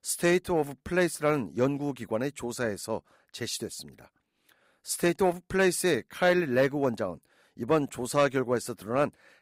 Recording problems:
none

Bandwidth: 15.5 kHz